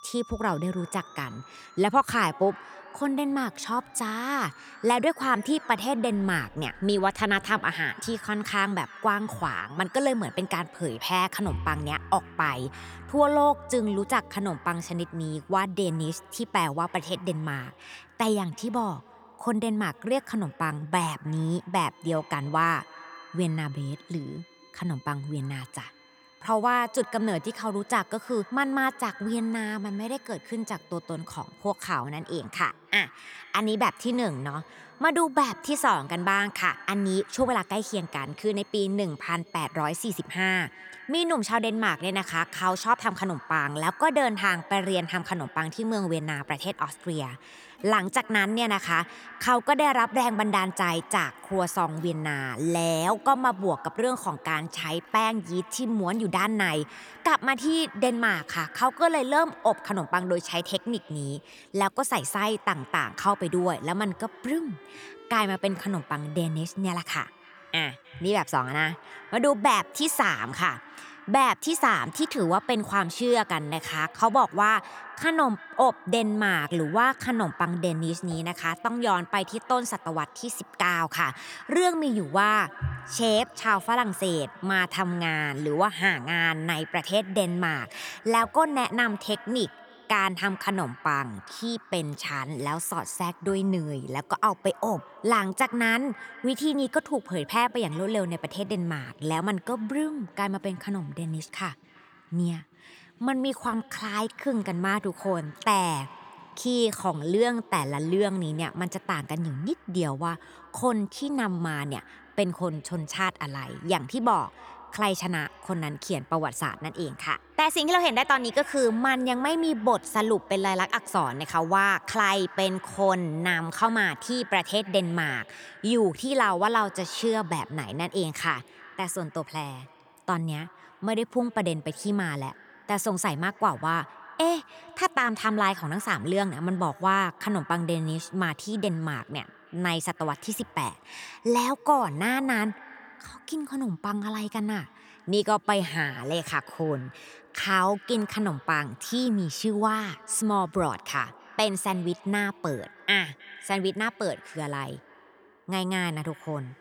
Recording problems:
echo of what is said; faint; throughout; 310 ms later, 20 dB below the speech
background music; faint; throughout; 25 dB below the speech

